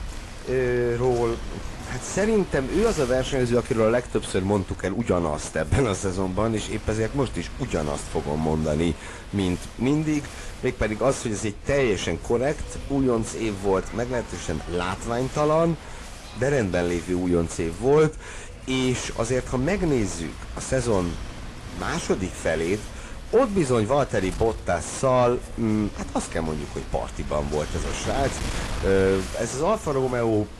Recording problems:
distortion; slight; 10 dB below the speech
garbled, watery; slightly
wind noise on the microphone; occasional gusts; 15 dB below the speech
chatter from many people; faint; throughout; 25 dB below the speech

